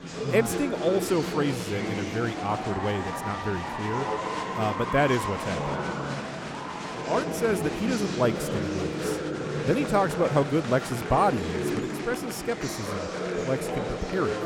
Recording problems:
murmuring crowd; loud; throughout; 3 dB below the speech

